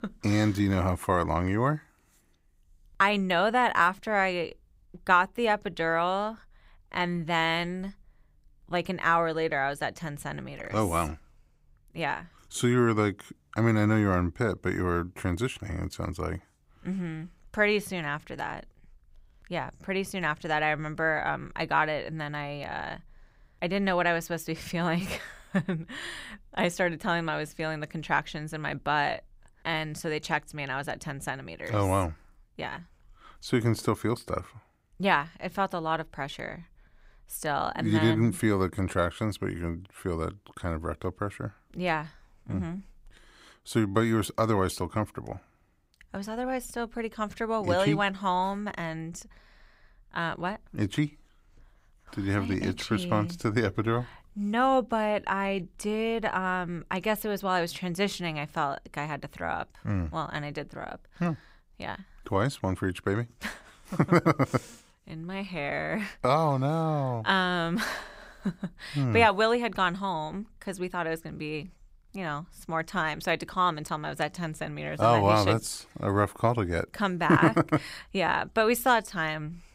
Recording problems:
none

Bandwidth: 15.5 kHz